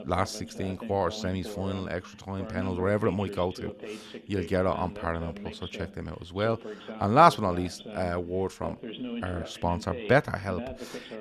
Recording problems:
voice in the background; noticeable; throughout; 10 dB below the speech

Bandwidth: 13.5 kHz